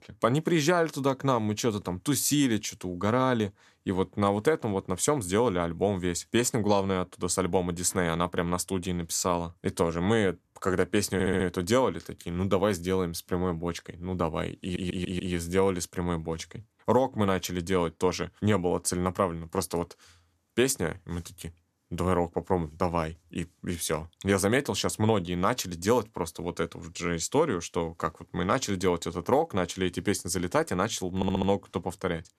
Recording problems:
audio stuttering; at 11 s, at 15 s and at 31 s

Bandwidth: 13.5 kHz